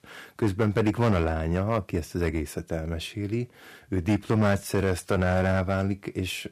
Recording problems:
distortion; slight; 5% of the sound clipped

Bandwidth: 14.5 kHz